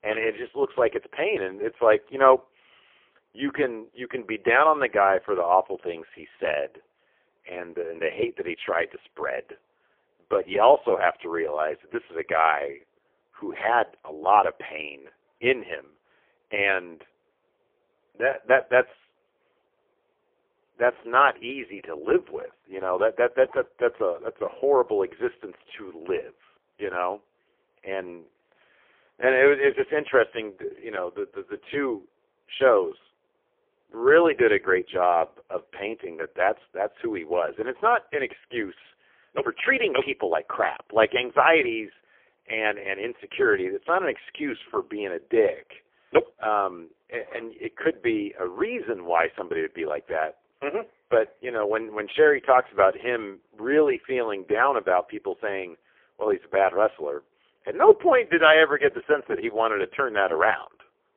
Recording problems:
phone-call audio; poor line; nothing above 3.5 kHz

